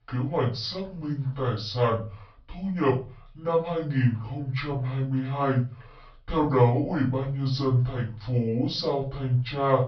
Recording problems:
off-mic speech; far
wrong speed and pitch; too slow and too low; 0.6 times normal speed
high frequencies cut off; noticeable; nothing above 5.5 kHz
room echo; slight; dies away in 0.3 s

